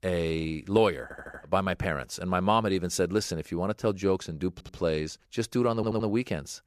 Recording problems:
audio stuttering; at 1 s, at 4.5 s and at 6 s

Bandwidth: 14.5 kHz